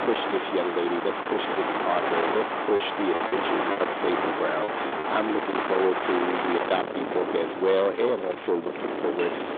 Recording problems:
distortion; heavy; 9 dB below the speech
phone-call audio; nothing above 3.5 kHz
wind in the background; loud; throughout; 2 dB below the speech
household noises; noticeable; throughout; 15 dB below the speech
choppy; very; from 3 to 5 s; 10% of the speech affected

